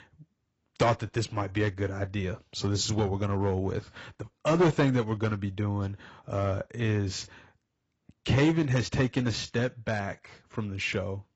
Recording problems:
garbled, watery; badly; nothing above 7.5 kHz
distortion; slight; 2% of the sound clipped

